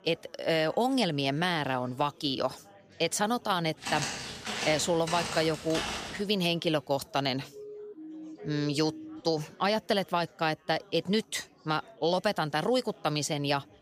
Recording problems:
chatter from many people; faint; throughout; 25 dB below the speech
footsteps; noticeable; from 4 to 6 s; peak 3 dB below the speech
siren; faint; from 7.5 to 9 s; peak 15 dB below the speech

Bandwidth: 15 kHz